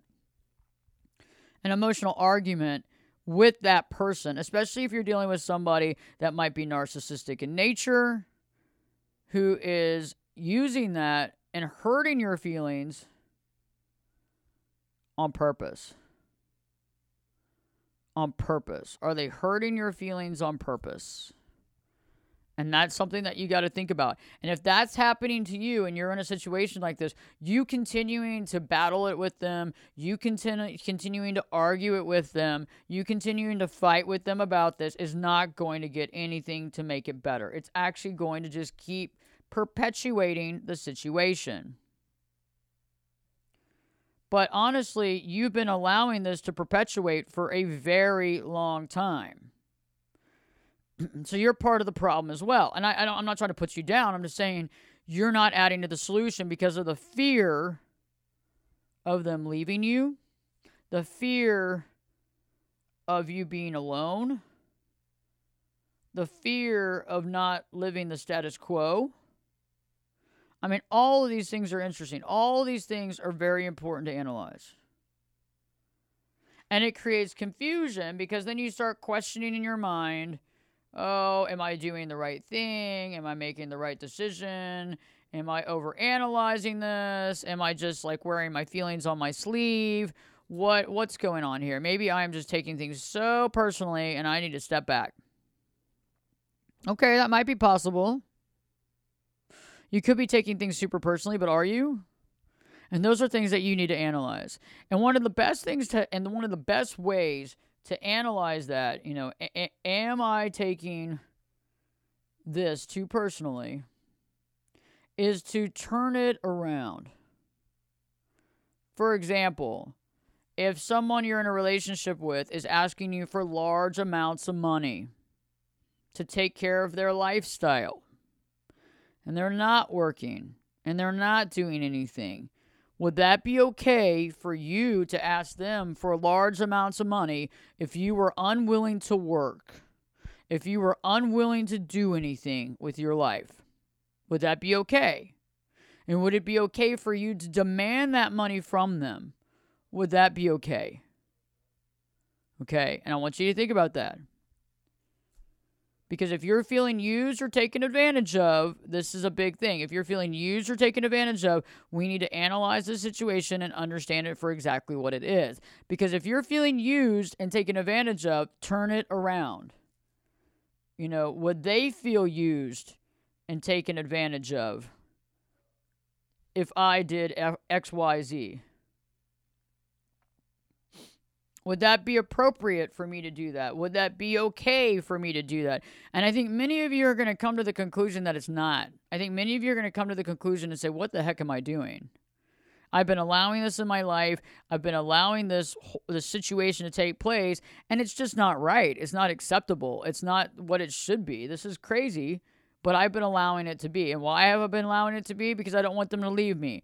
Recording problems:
none

